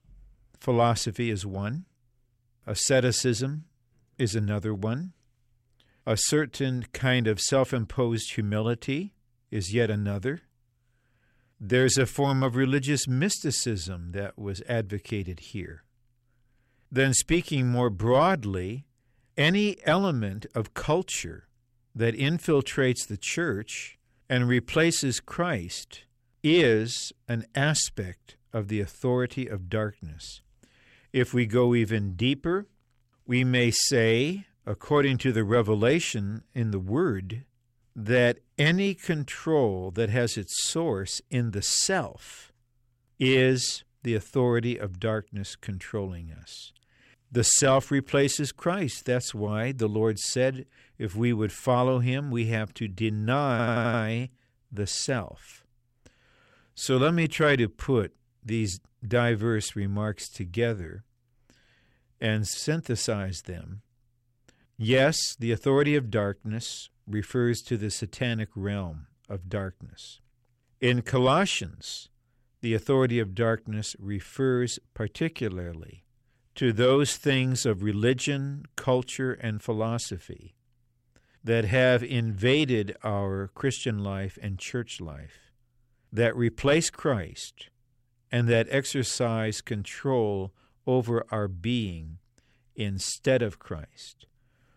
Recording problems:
audio stuttering; at 54 s

